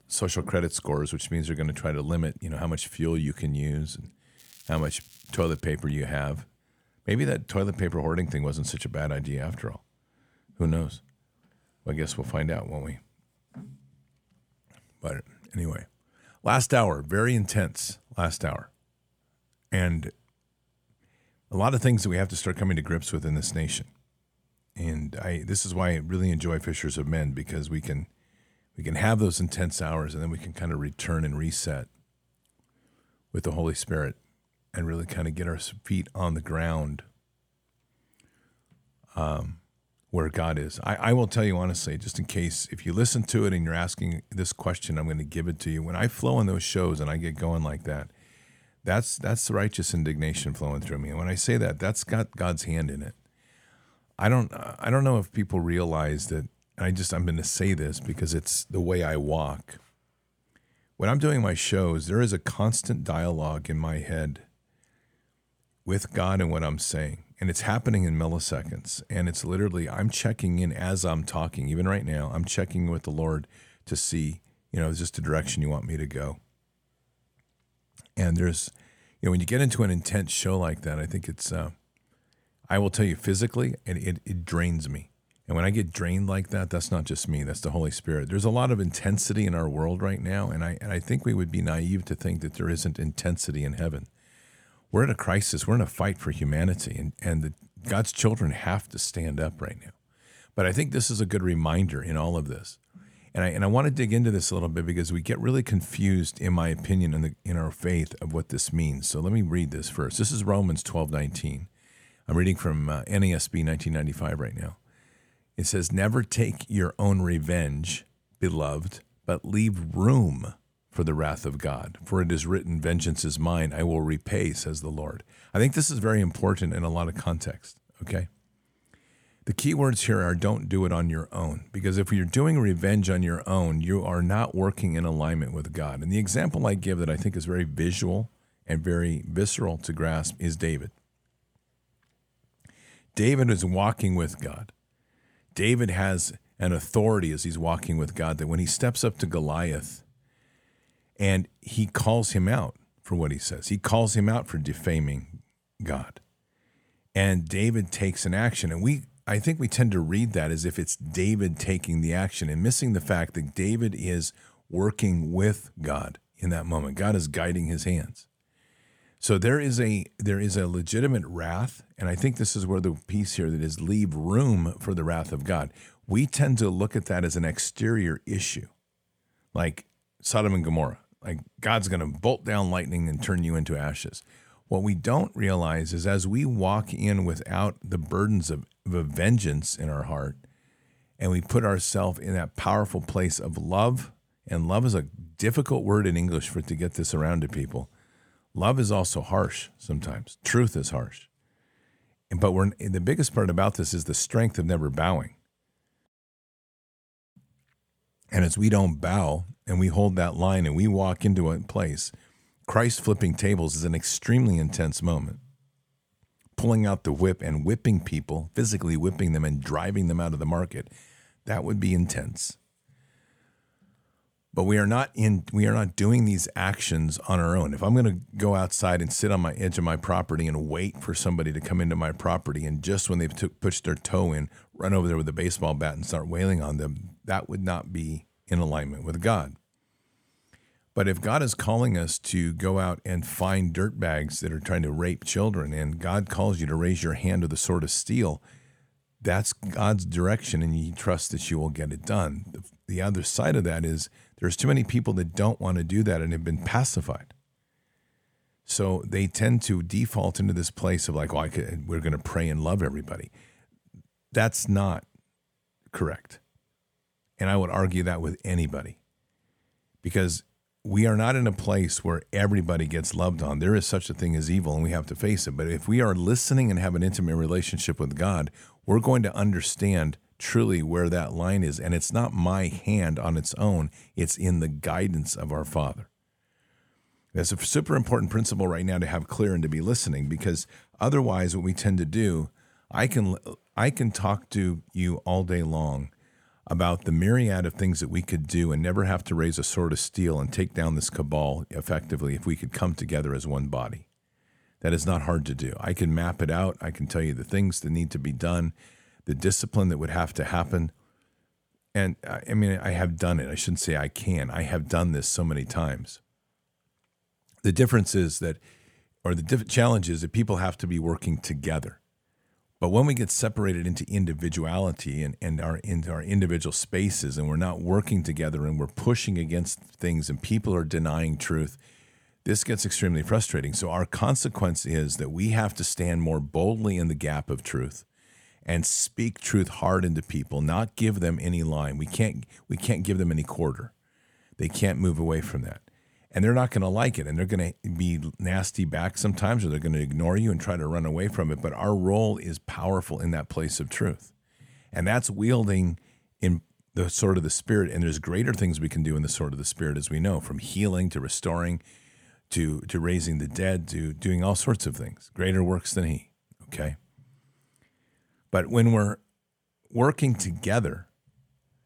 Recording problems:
crackling; faint; from 4.5 to 5.5 s and at 4:03; 25 dB below the speech

